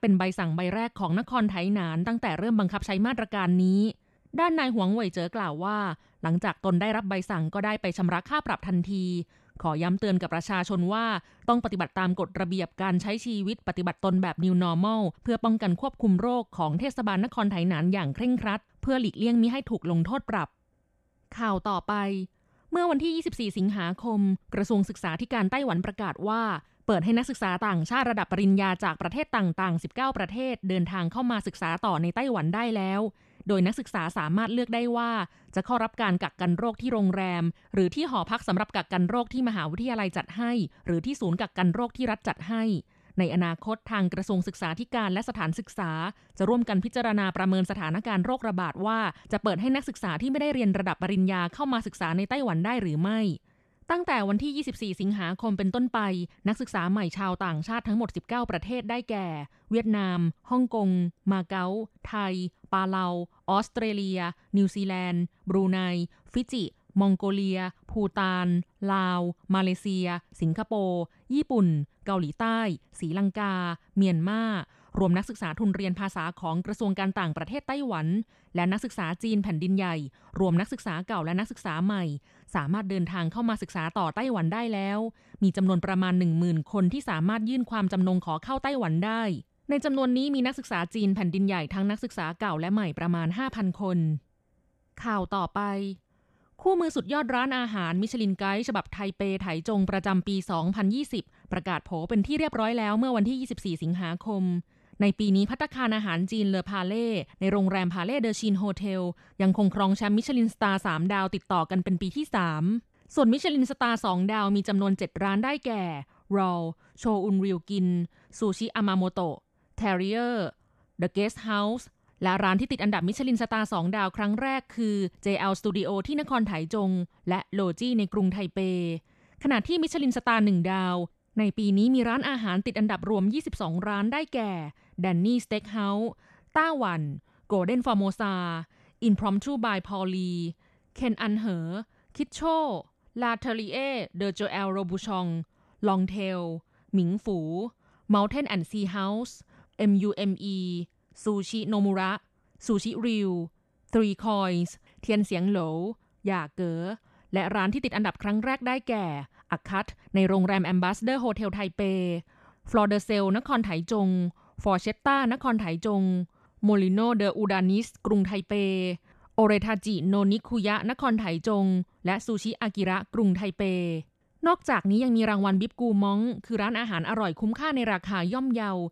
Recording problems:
none

